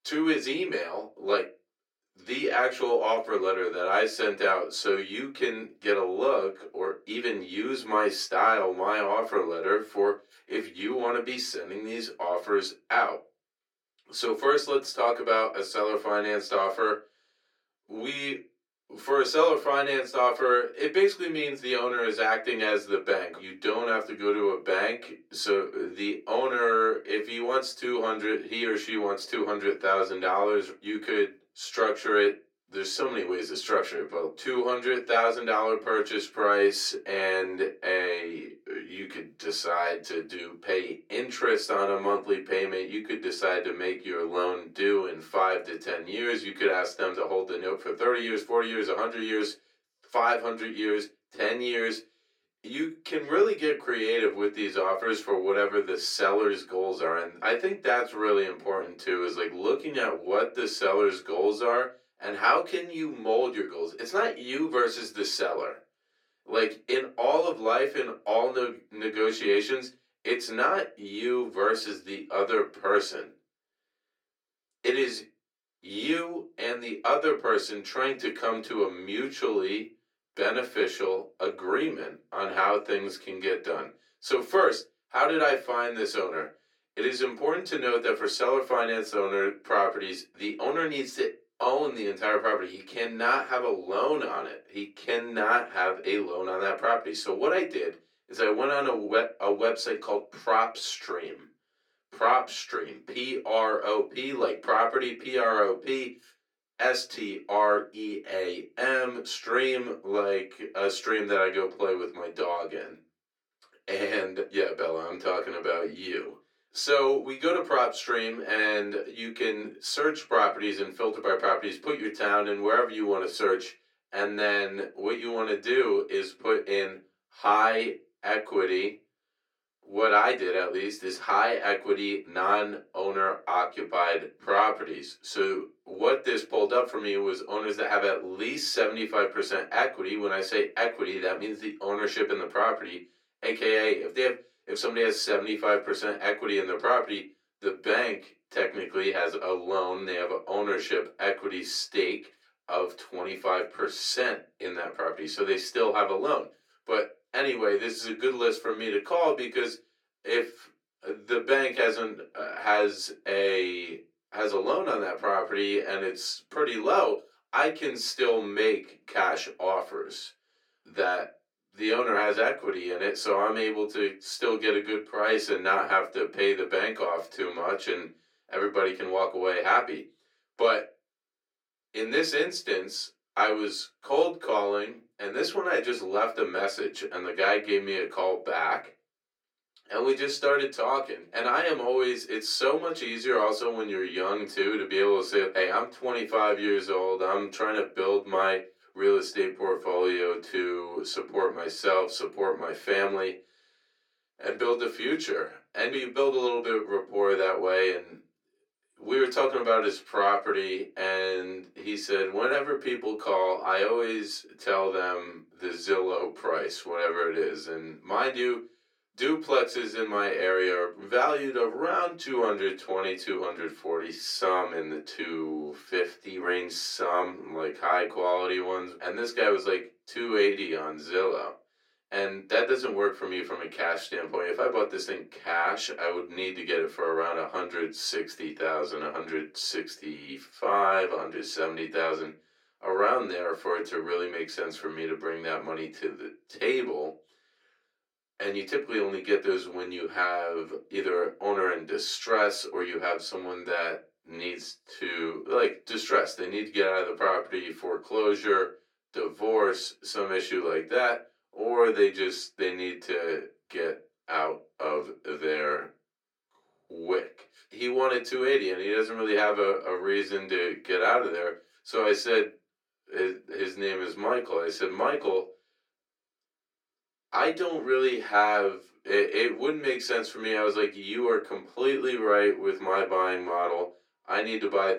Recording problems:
off-mic speech; far
thin; very; fading below 350 Hz
room echo; very slight; dies away in 0.2 s

